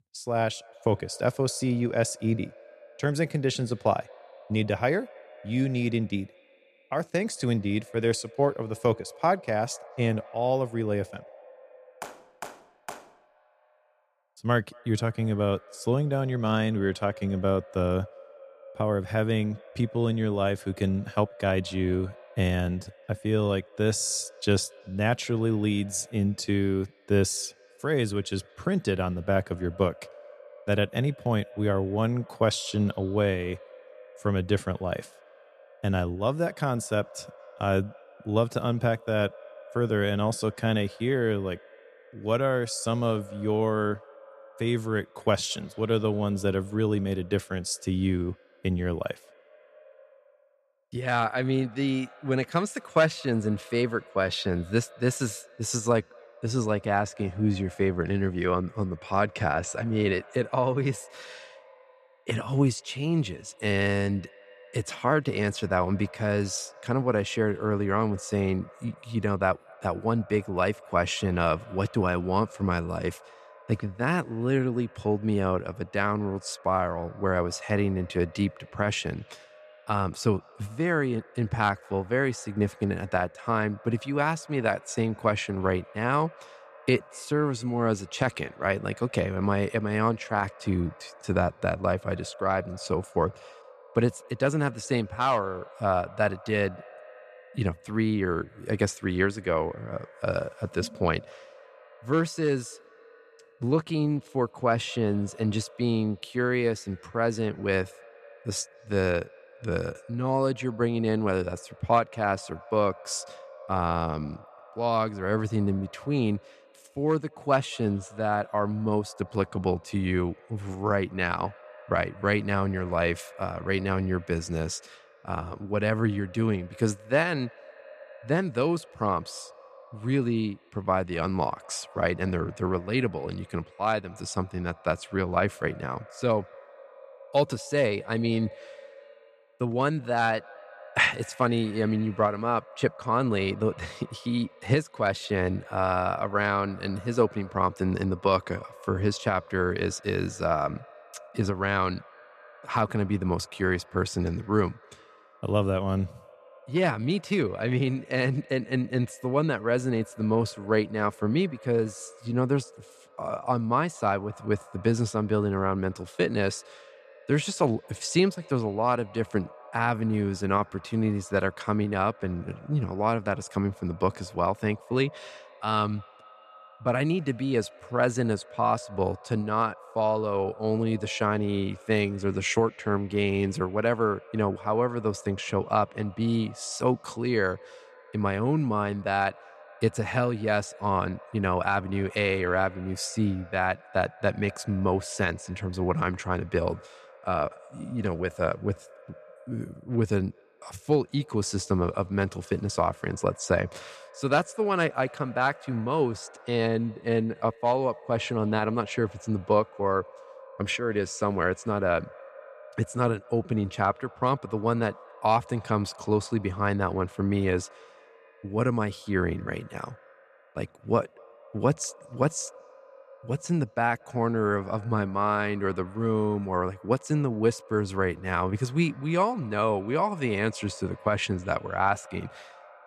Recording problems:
echo of what is said; faint; throughout; 230 ms later, 20 dB below the speech

